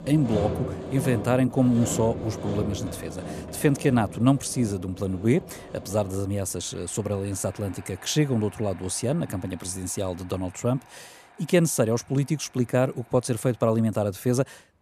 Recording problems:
machinery noise; noticeable; throughout; 10 dB below the speech

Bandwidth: 14 kHz